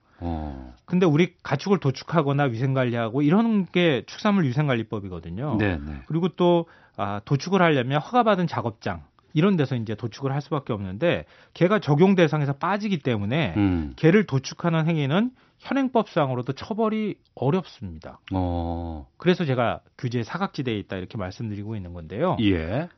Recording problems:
high frequencies cut off; noticeable; nothing above 6 kHz

